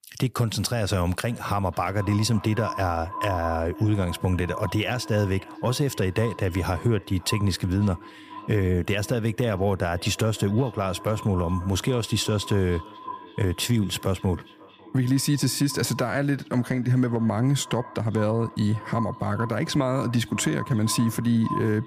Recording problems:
echo of what is said; noticeable; throughout; 550 ms later, 15 dB below the speech

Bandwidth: 15 kHz